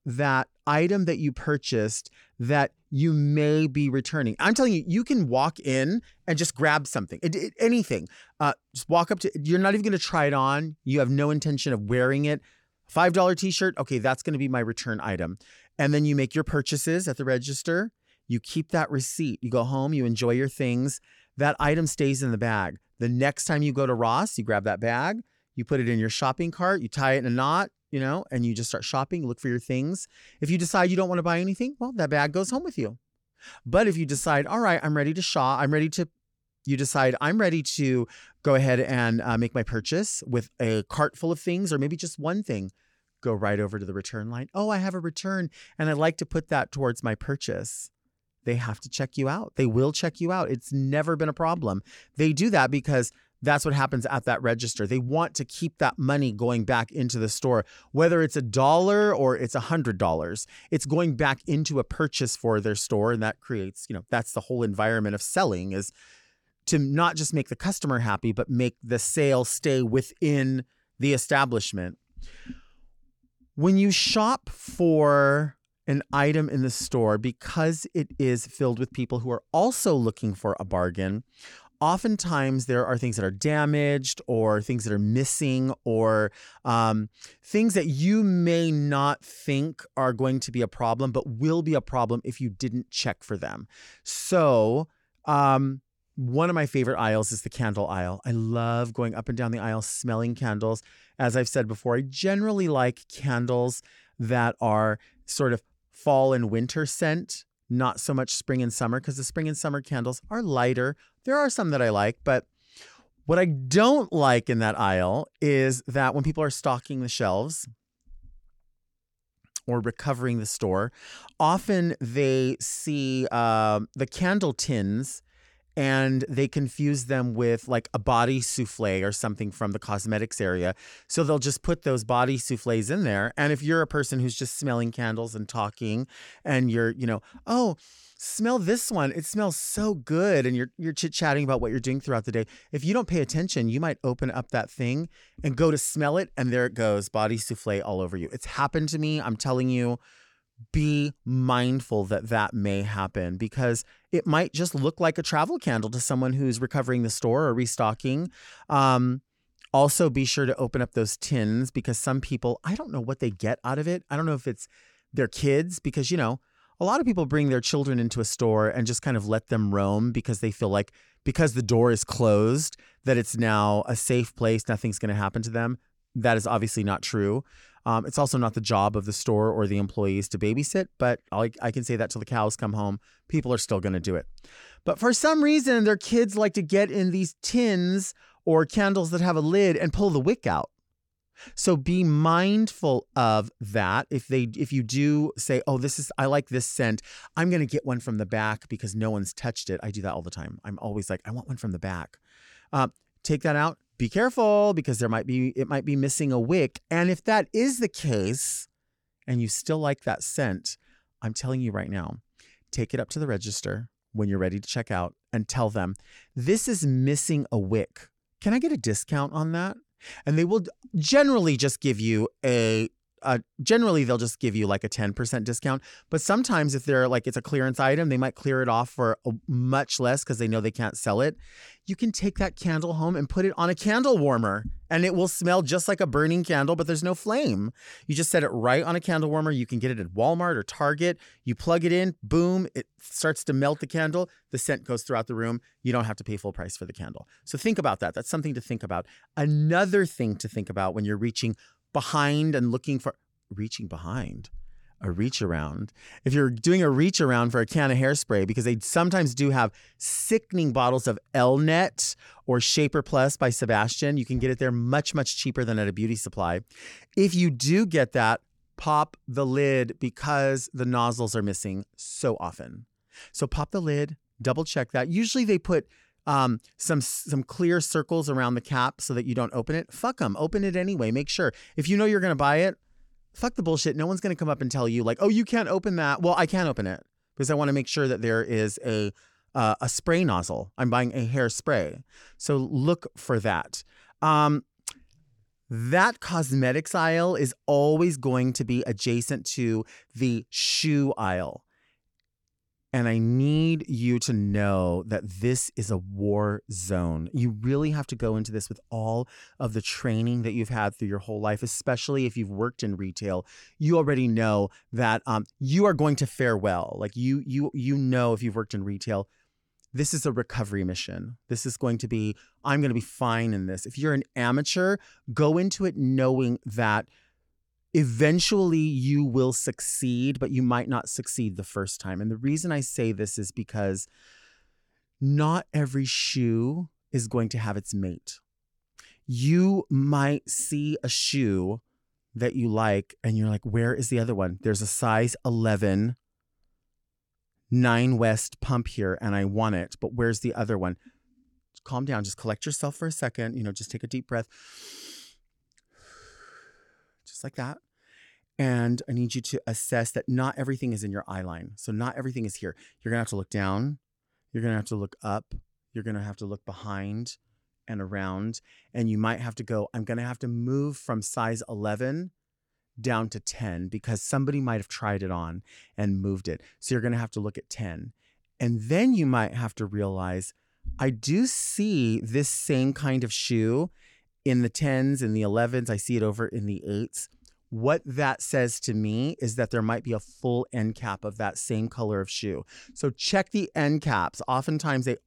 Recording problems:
none

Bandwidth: 18 kHz